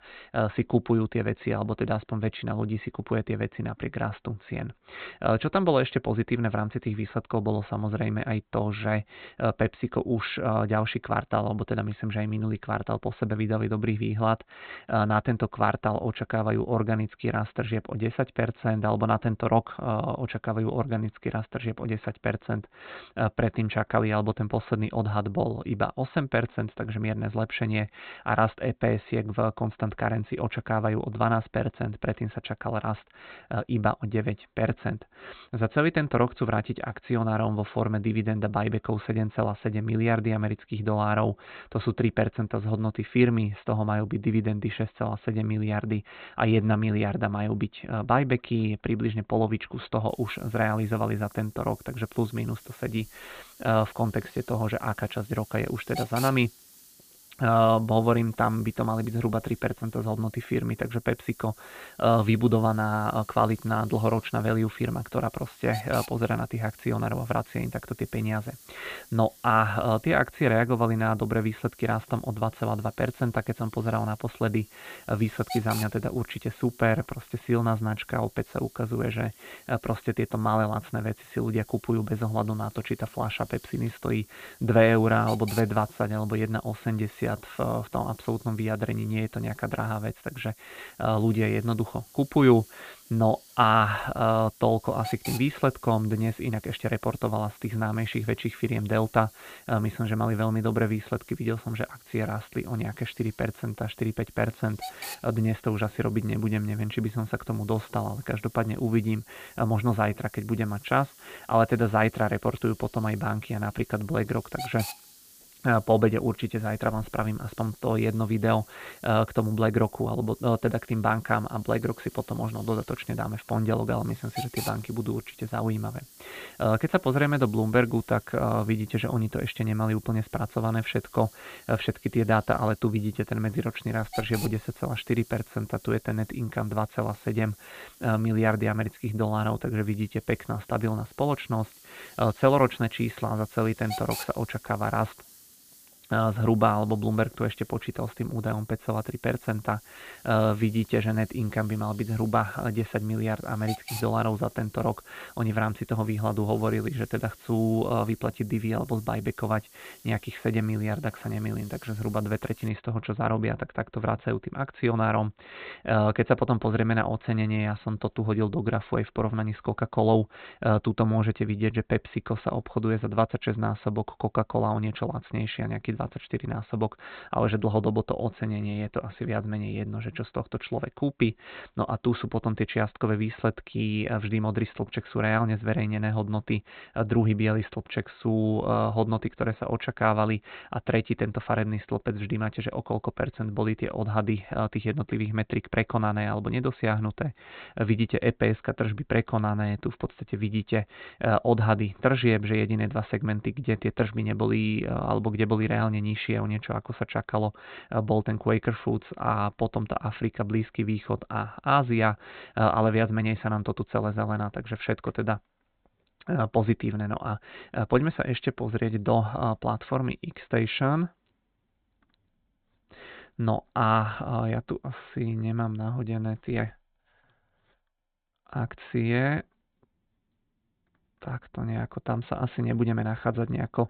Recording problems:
high frequencies cut off; severe; nothing above 4 kHz
hiss; noticeable; from 50 s to 2:43; 20 dB below the speech

